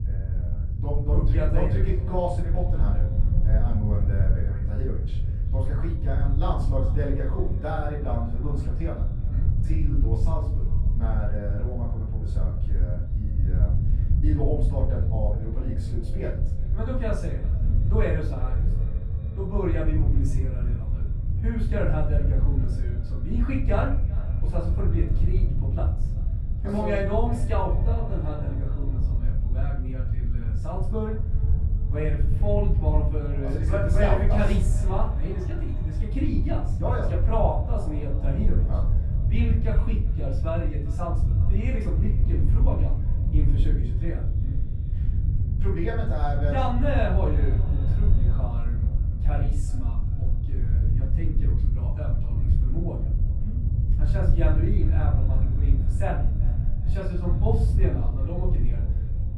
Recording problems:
off-mic speech; far
room echo; noticeable; dies away in 0.4 s
echo of what is said; faint; throughout; 390 ms later, 20 dB below the speech
low rumble; loud; throughout; 8 dB below the speech

